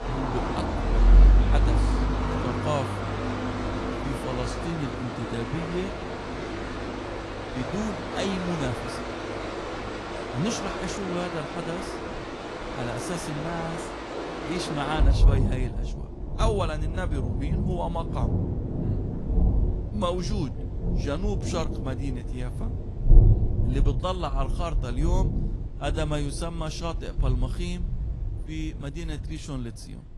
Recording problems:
garbled, watery; slightly; nothing above 11 kHz
rain or running water; very loud; throughout; 4 dB above the speech
wind noise on the microphone; occasional gusts; from 3.5 to 14 s and from 17 to 25 s; 15 dB below the speech

